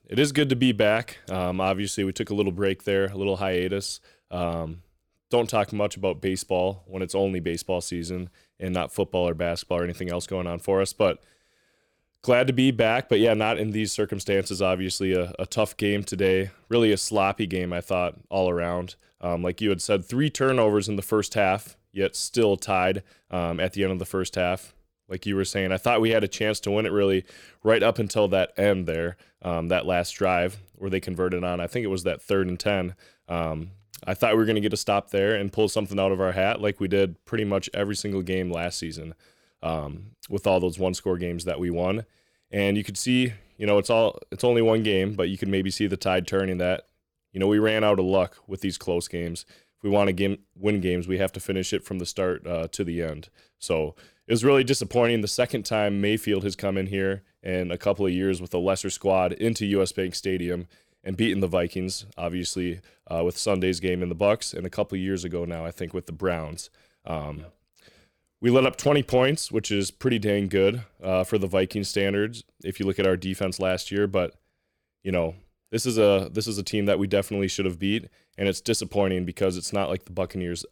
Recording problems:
none

